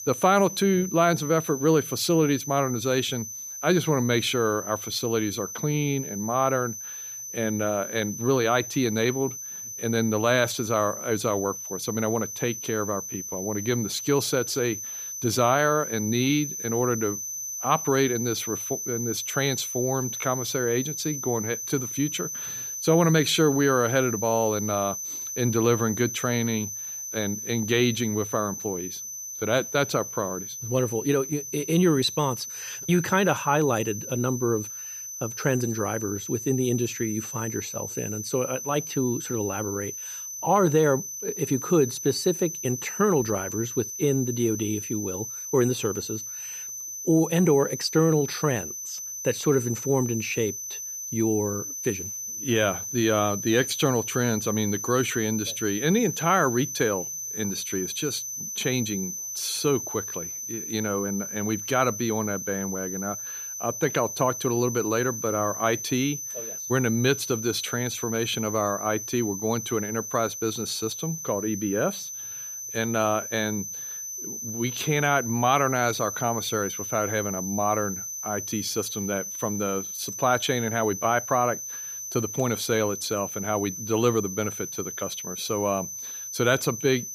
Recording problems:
high-pitched whine; loud; throughout; 6 kHz, 6 dB below the speech

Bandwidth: 15 kHz